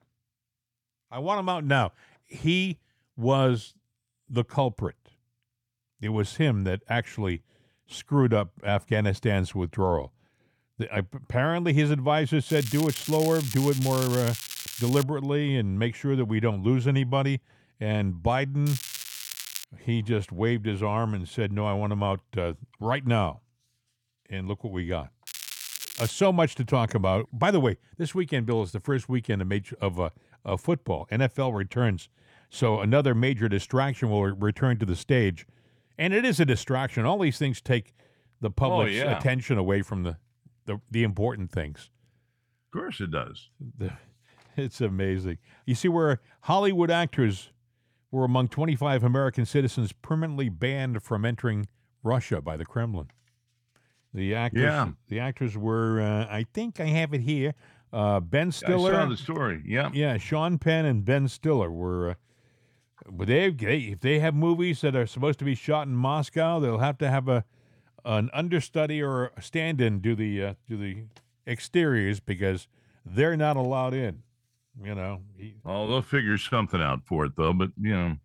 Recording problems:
crackling; loud; from 13 to 15 s, at 19 s and at 25 s; 9 dB below the speech

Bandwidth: 17.5 kHz